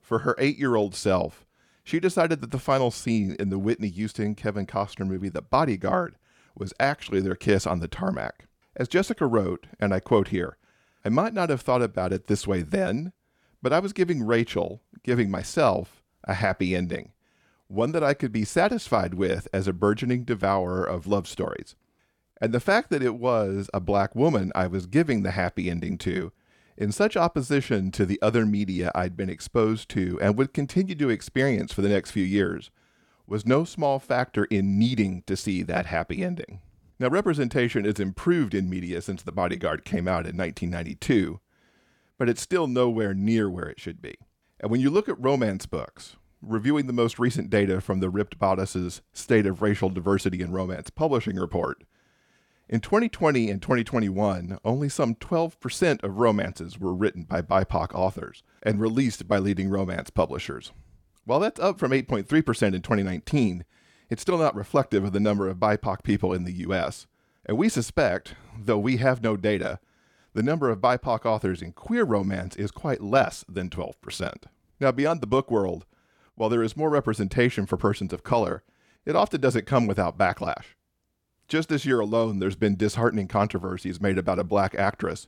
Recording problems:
none

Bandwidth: 17 kHz